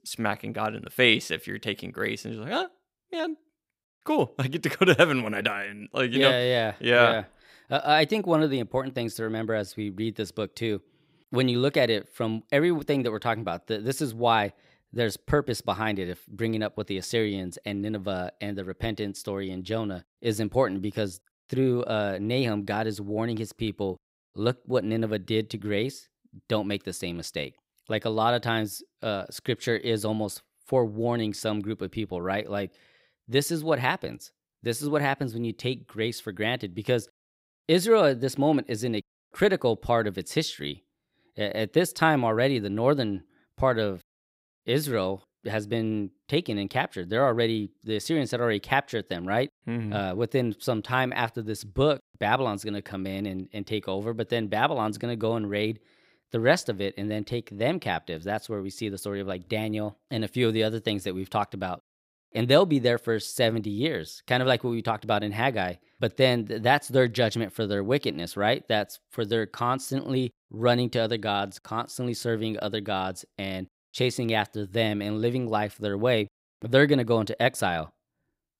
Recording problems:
none

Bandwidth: 15.5 kHz